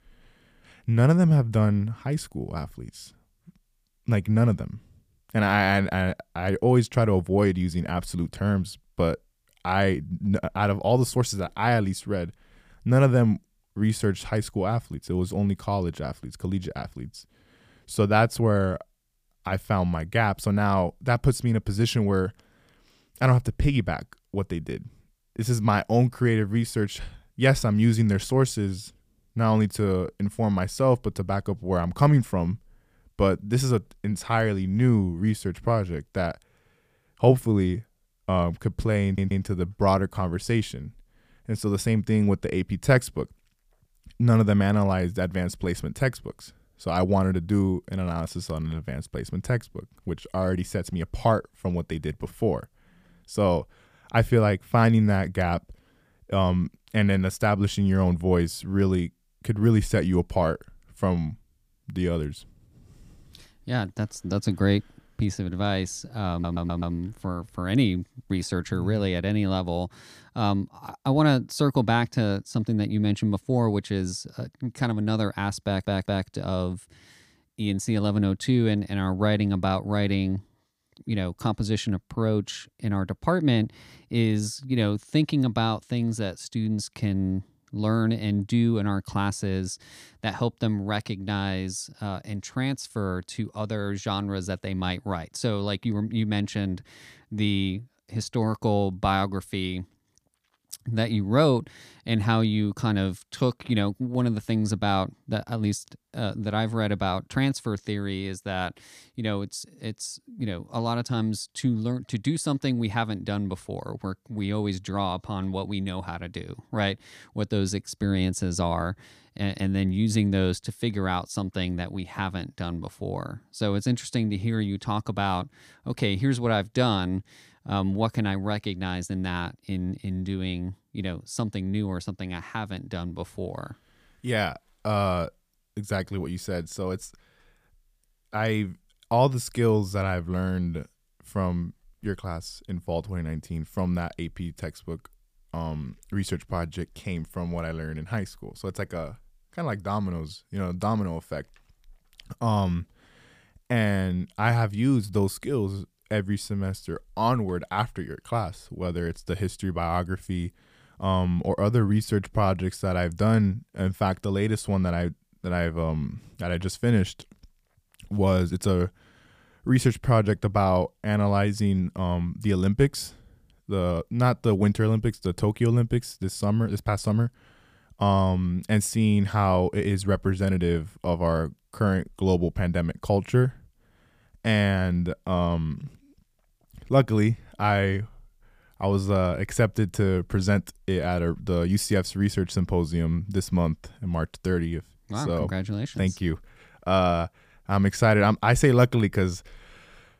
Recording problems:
audio stuttering; at 39 s, at 1:06 and at 1:16

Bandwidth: 15 kHz